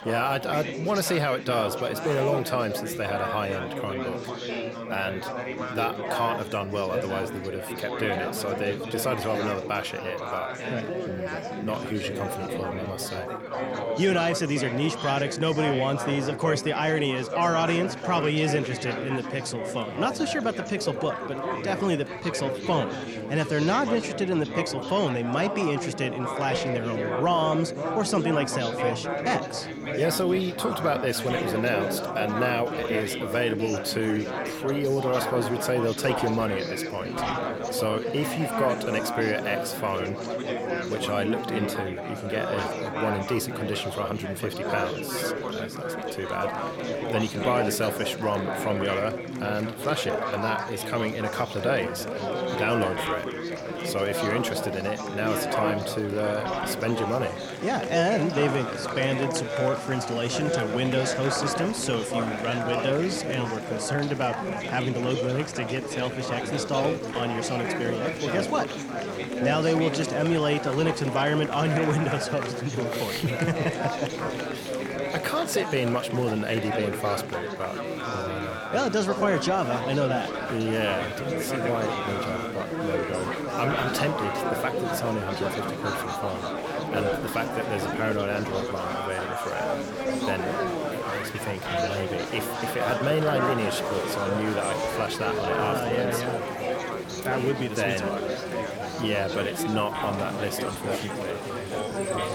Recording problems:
chatter from many people; loud; throughout; 2 dB below the speech

